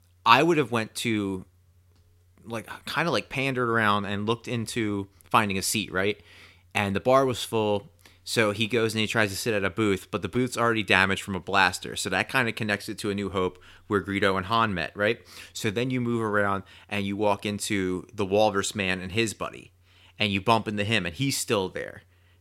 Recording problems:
none

